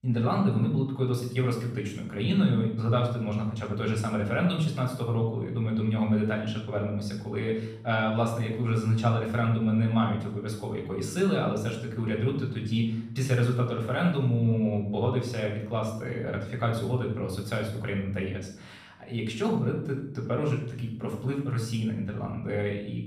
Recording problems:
off-mic speech; far
room echo; noticeable; dies away in 0.7 s

